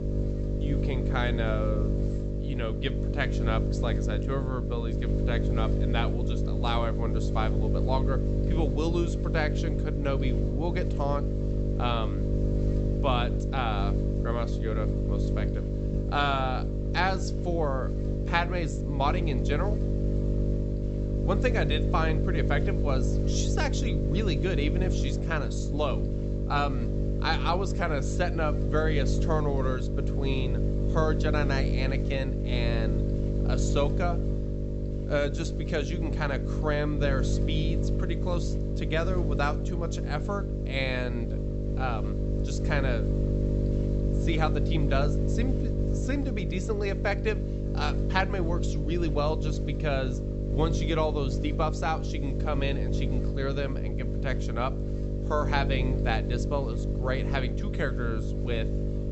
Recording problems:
high frequencies cut off; noticeable; nothing above 8 kHz
electrical hum; loud; throughout; 50 Hz, 5 dB below the speech

